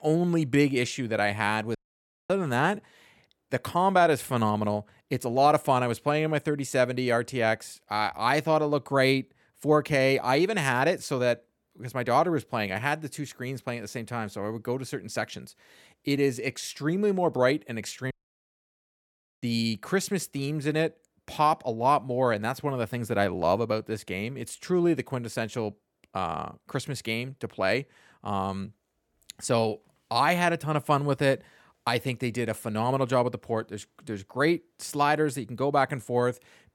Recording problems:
audio cutting out; at 2 s for 0.5 s and at 18 s for 1.5 s

